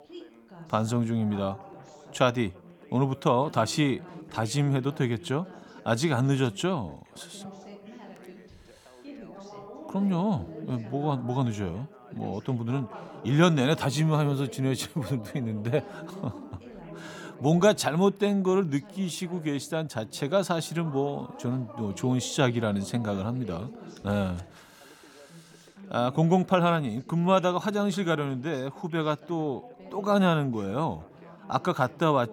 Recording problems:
background chatter; noticeable; throughout; 3 voices, 20 dB below the speech

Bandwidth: 18 kHz